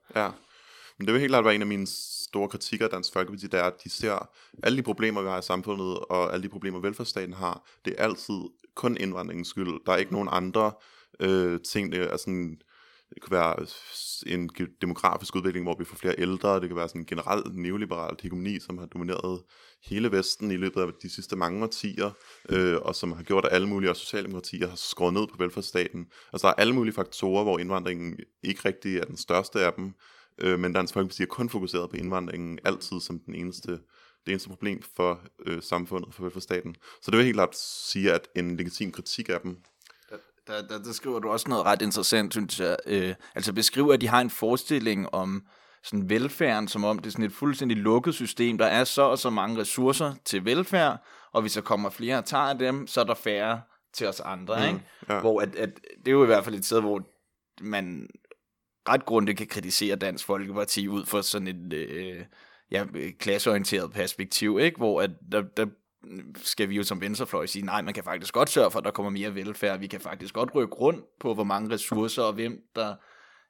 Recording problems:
none

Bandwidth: 18 kHz